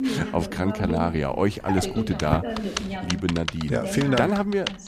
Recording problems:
household noises; loud; throughout; 8 dB below the speech
voice in the background; loud; throughout; 7 dB below the speech

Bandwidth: 14.5 kHz